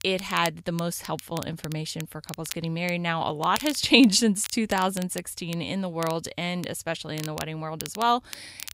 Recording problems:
crackle, like an old record; noticeable; 15 dB below the speech

